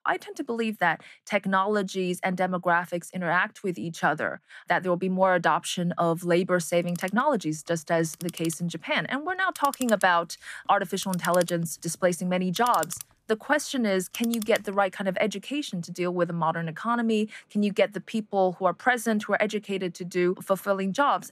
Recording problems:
household noises; noticeable; from 7 s on; 15 dB below the speech

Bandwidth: 14.5 kHz